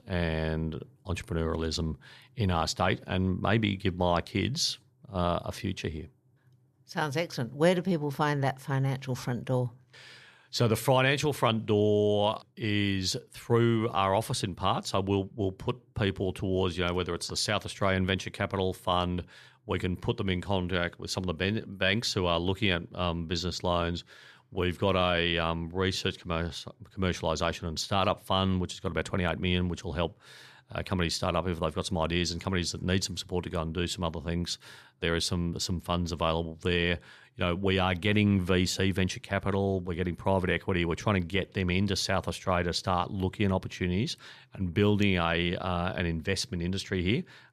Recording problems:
none

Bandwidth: 14 kHz